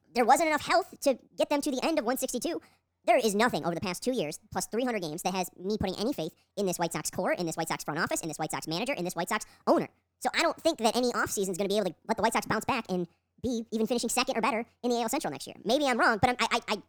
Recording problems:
wrong speed and pitch; too fast and too high; 1.5 times normal speed

